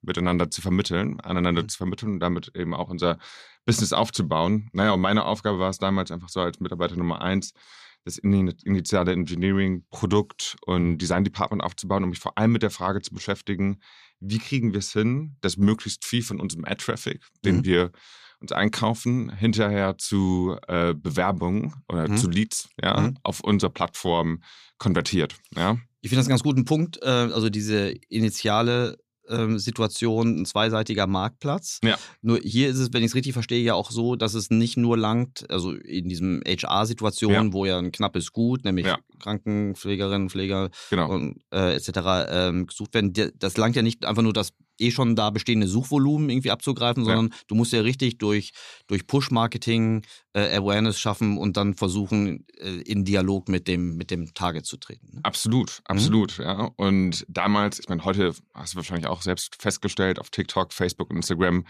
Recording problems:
none

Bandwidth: 14.5 kHz